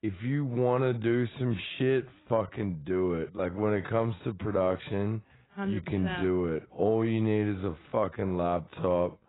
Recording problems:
garbled, watery; badly; nothing above 4 kHz
wrong speed, natural pitch; too slow; 0.6 times normal speed

